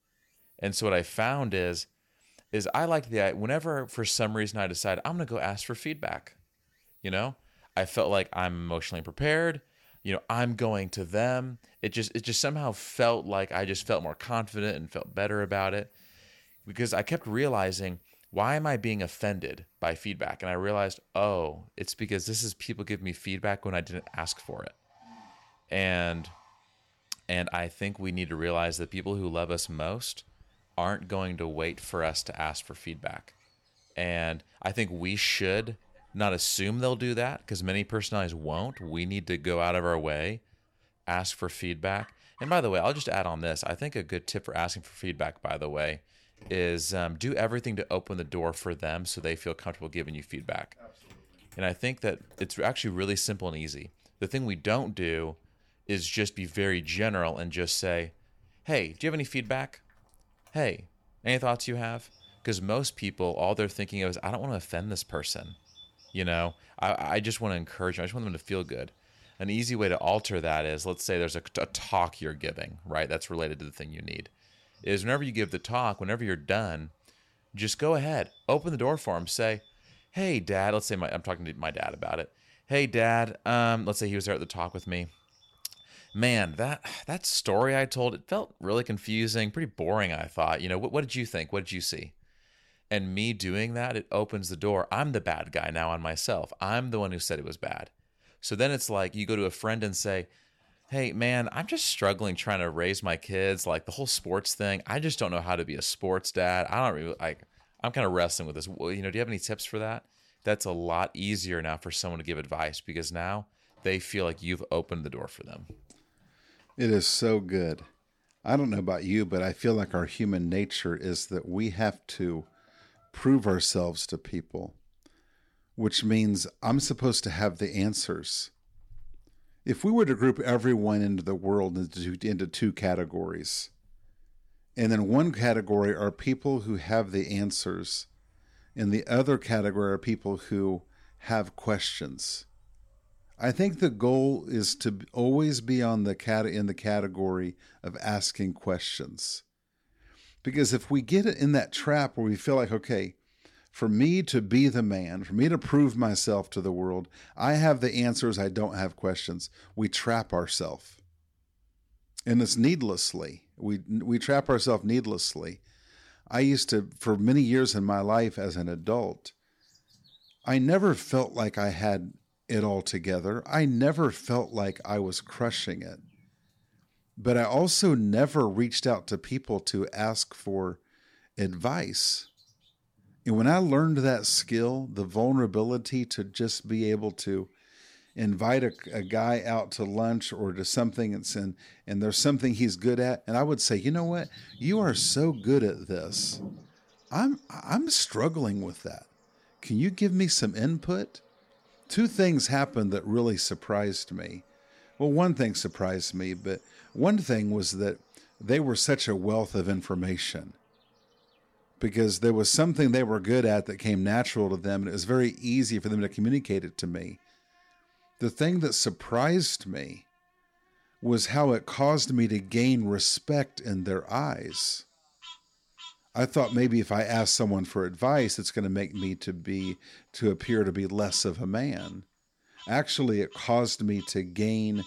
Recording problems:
animal sounds; faint; throughout; 30 dB below the speech

